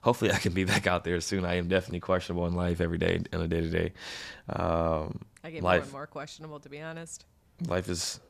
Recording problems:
none

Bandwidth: 14.5 kHz